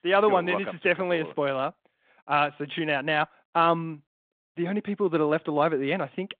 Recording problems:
phone-call audio

